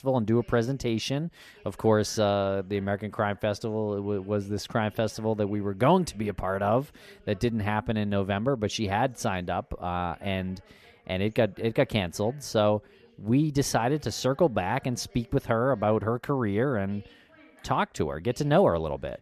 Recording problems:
voice in the background; faint; throughout; 30 dB below the speech

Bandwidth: 14.5 kHz